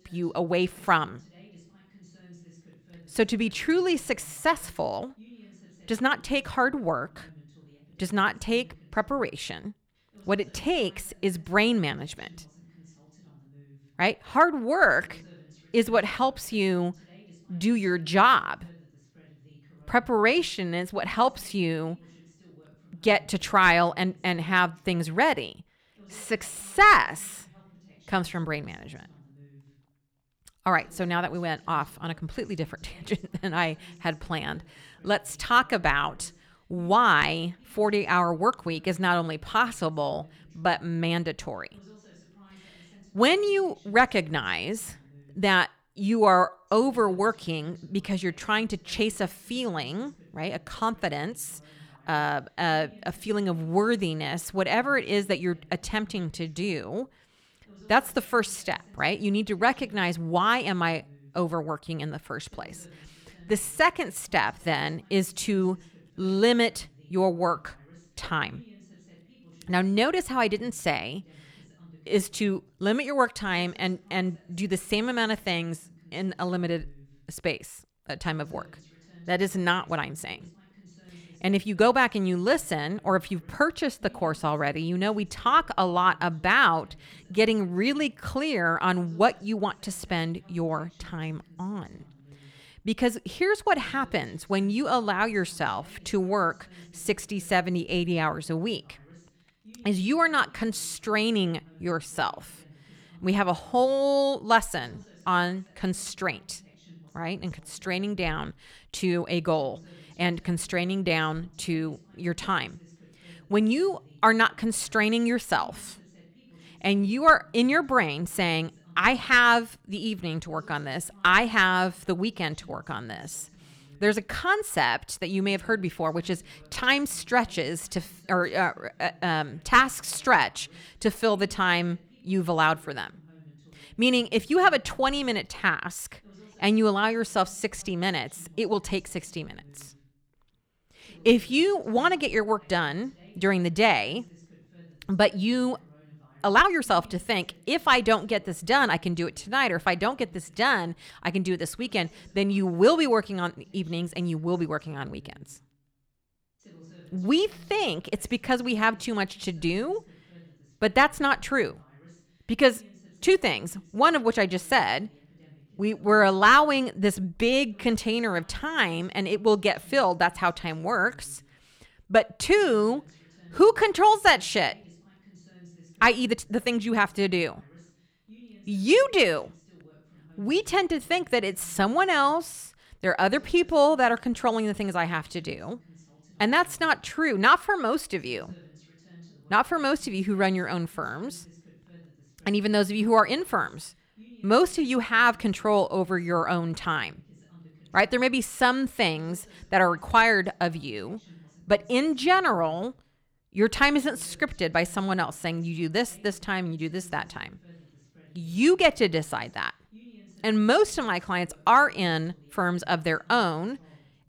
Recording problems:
voice in the background; faint; throughout; 30 dB below the speech
uneven, jittery; strongly; from 21 s to 3:08

